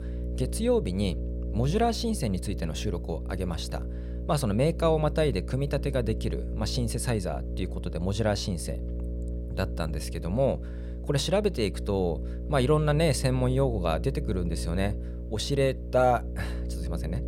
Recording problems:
electrical hum; noticeable; throughout; 60 Hz, 15 dB below the speech

